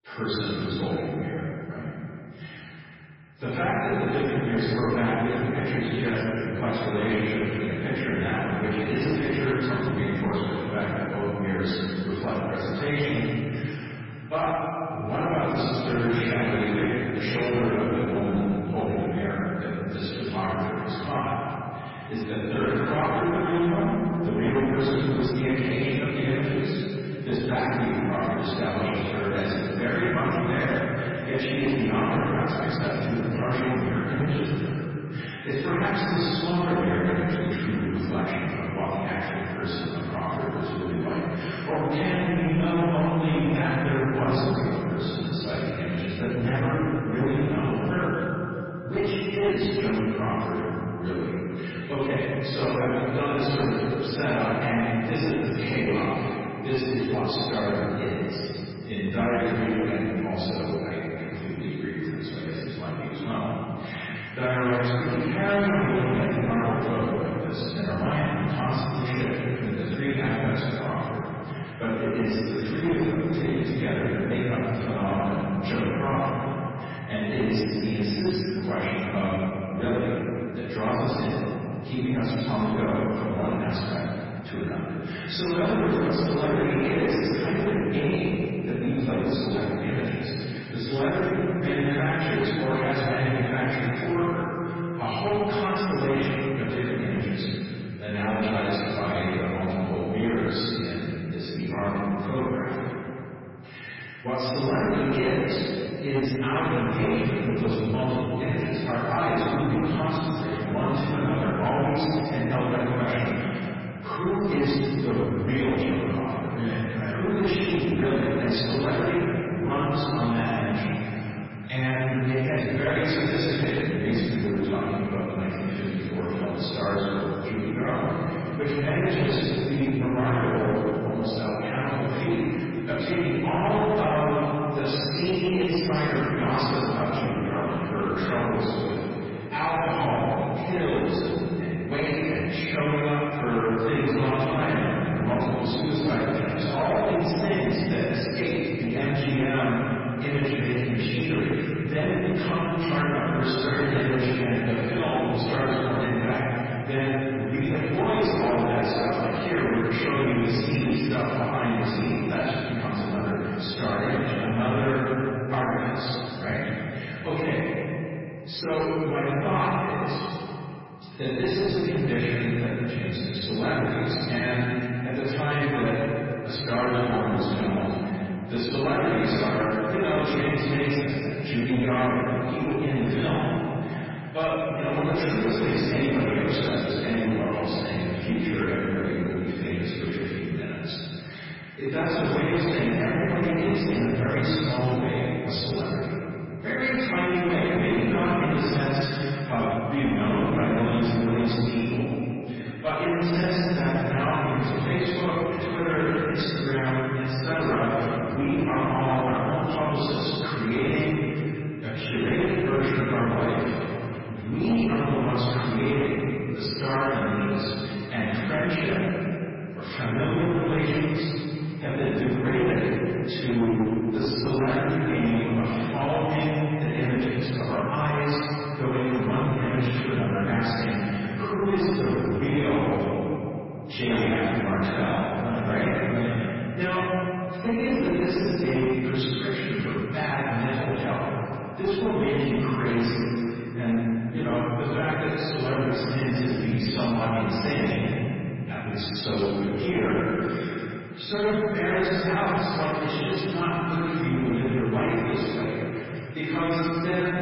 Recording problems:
room echo; strong; dies away in 3 s
off-mic speech; far
garbled, watery; badly; nothing above 5.5 kHz
distortion; slight; 13% of the sound clipped

